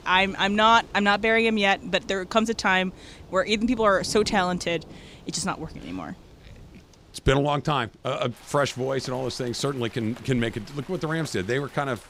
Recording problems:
rain or running water; faint; throughout; 20 dB below the speech

